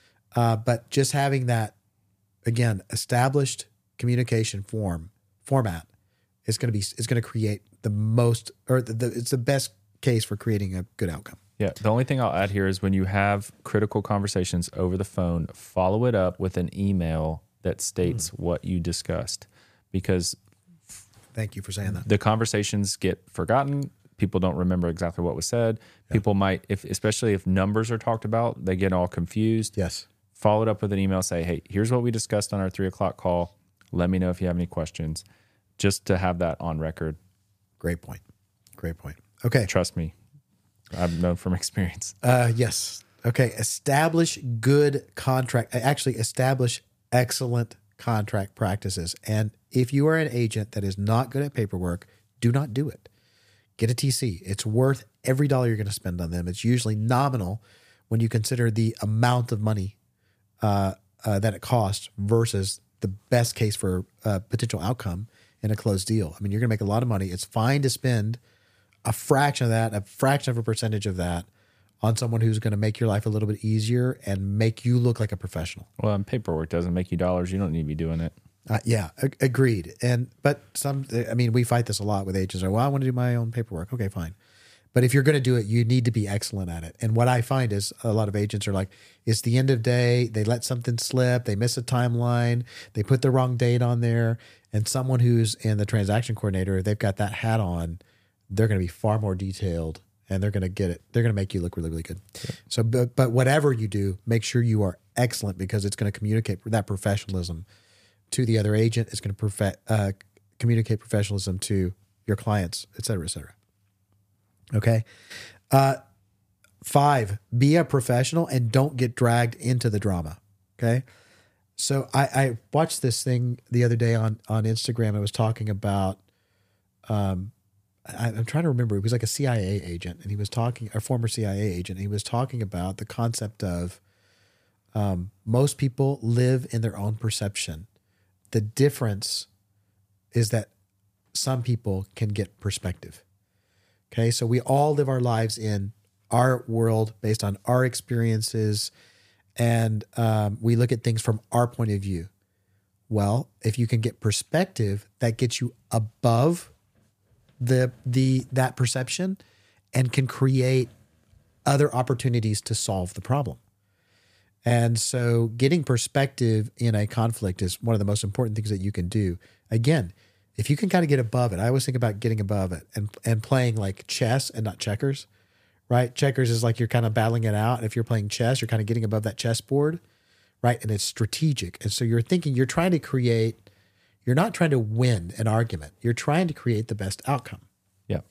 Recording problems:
none

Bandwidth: 15 kHz